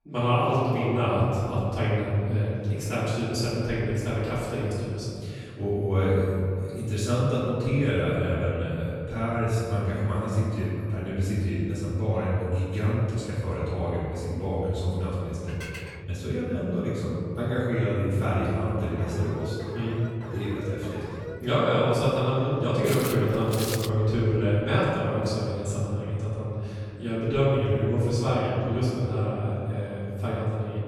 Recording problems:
room echo; strong; dies away in 2.4 s
off-mic speech; far
clattering dishes; faint; at 15 s; peak 10 dB below the speech
alarm; faint; from 19 to 21 s; peak 15 dB below the speech
footsteps; noticeable; from 23 to 24 s; peak 5 dB below the speech

